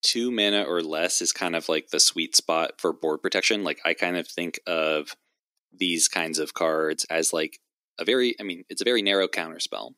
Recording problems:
thin; somewhat; fading below 300 Hz
uneven, jittery; strongly; from 2 to 9 s

